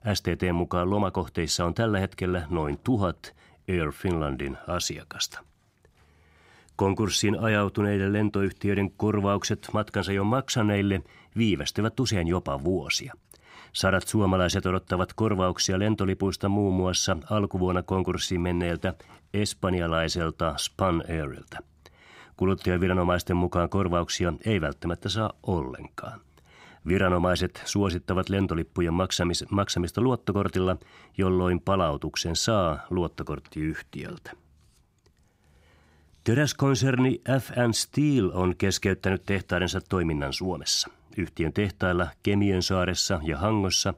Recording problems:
none

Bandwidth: 15.5 kHz